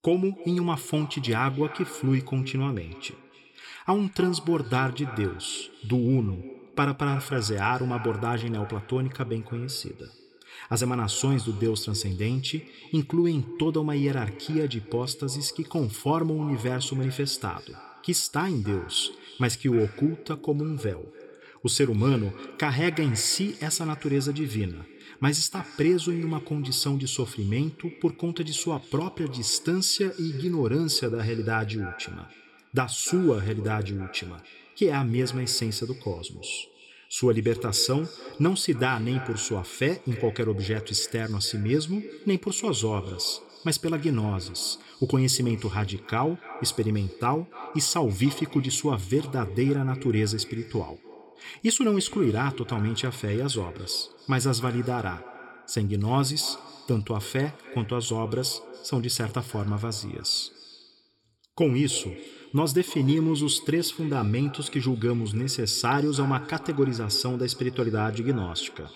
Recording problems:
echo of what is said; noticeable; throughout; 290 ms later, 15 dB below the speech

